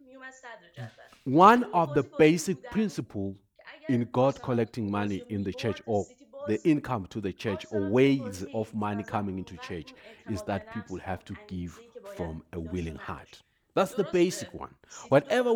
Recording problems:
voice in the background; noticeable; throughout; 20 dB below the speech
abrupt cut into speech; at the end

